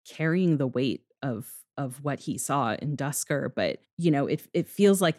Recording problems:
none

